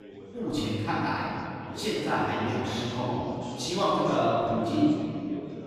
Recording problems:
room echo; strong; dies away in 2.4 s
off-mic speech; far
chatter from many people; noticeable; throughout; 10 dB below the speech

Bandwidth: 15 kHz